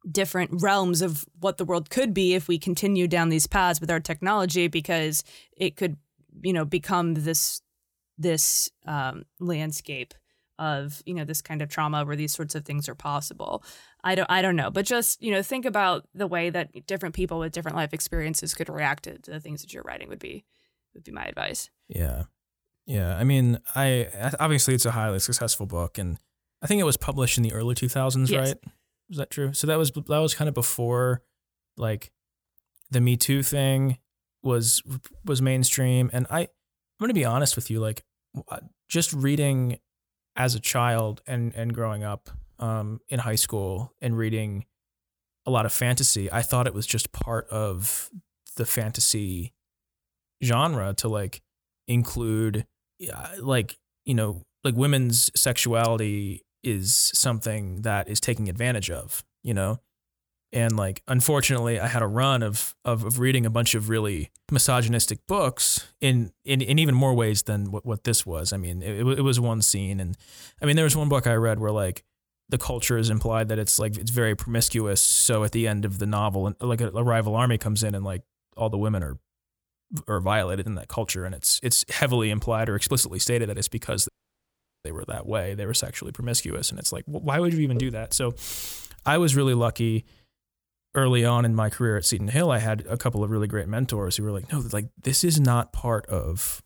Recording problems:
audio cutting out; at 1:24 for 1 s

